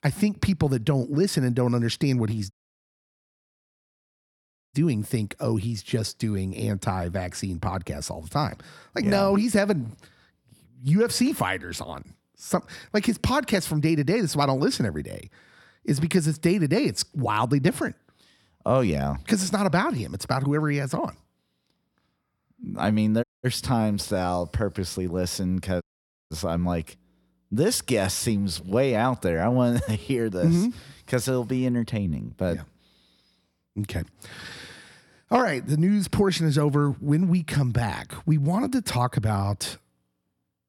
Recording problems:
audio cutting out; at 2.5 s for 2 s, at 23 s and at 26 s

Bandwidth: 17 kHz